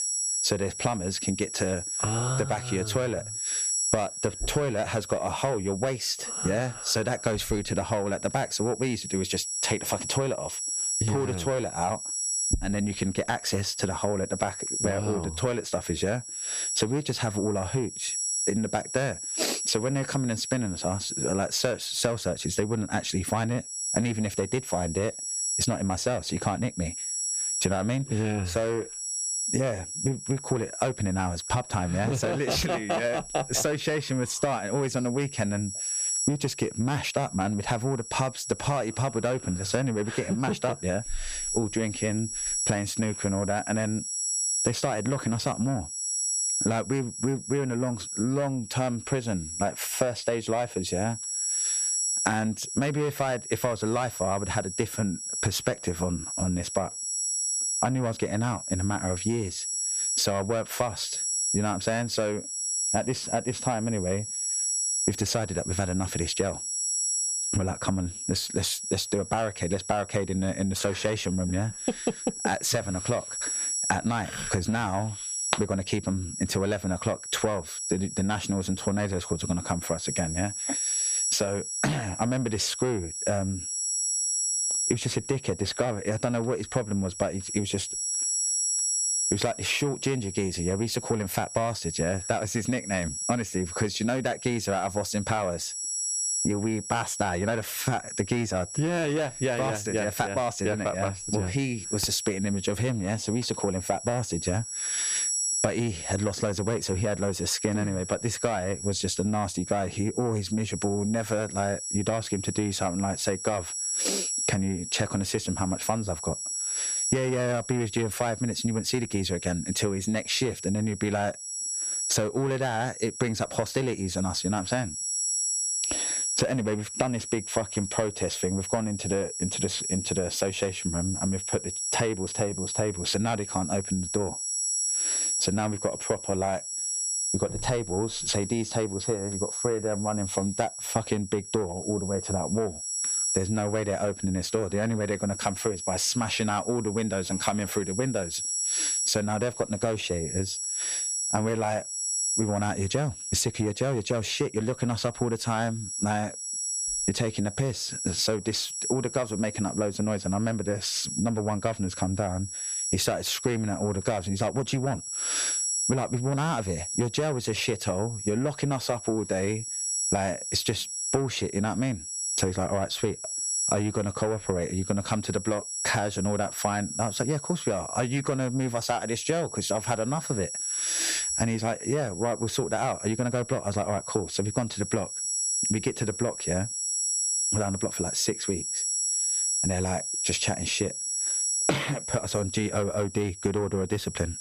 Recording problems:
distortion; slight; 10 dB below the speech
squashed, flat; somewhat
high-pitched whine; loud; throughout; 7.5 kHz, 2 dB below the speech

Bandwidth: 14.5 kHz